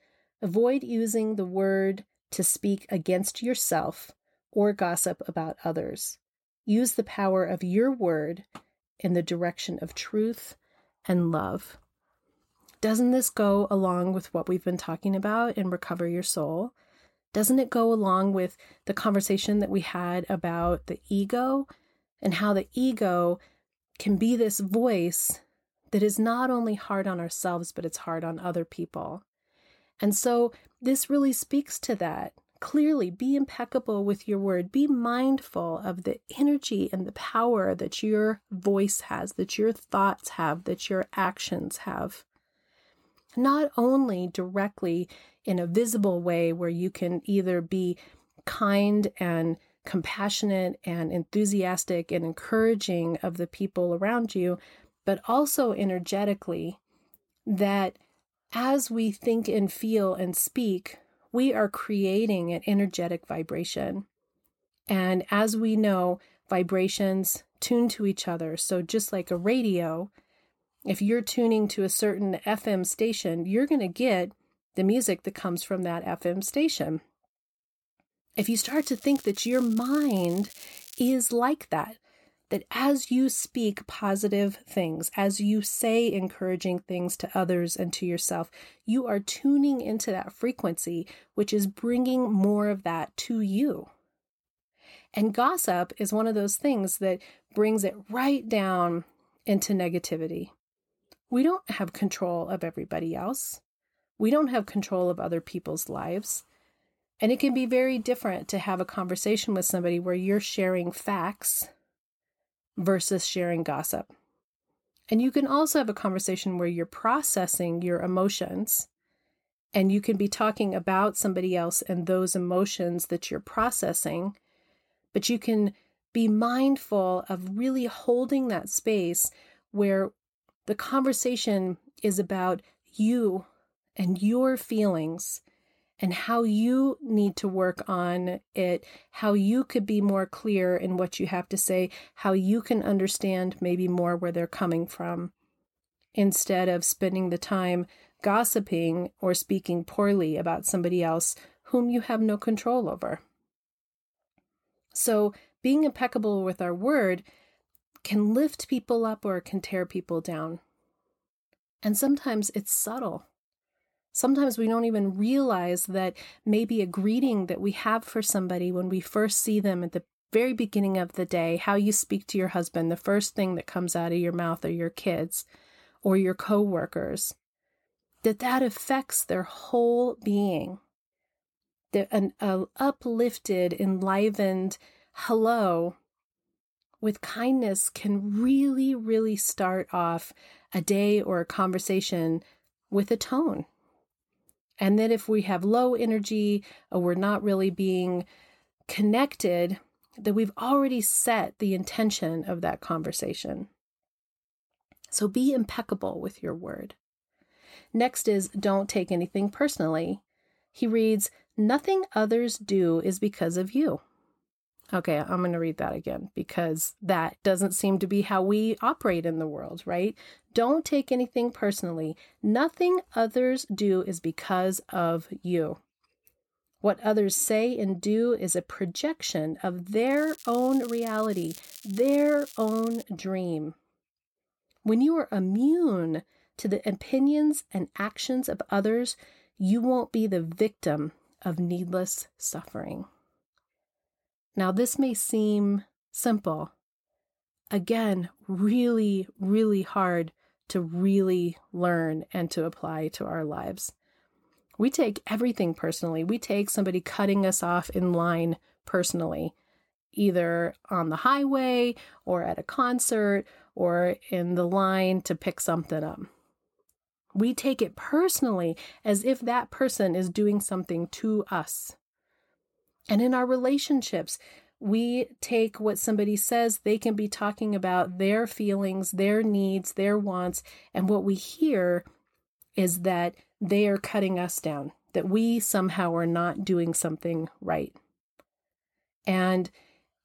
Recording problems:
crackling; noticeable; from 1:18 to 1:21 and from 3:50 to 3:53; 20 dB below the speech

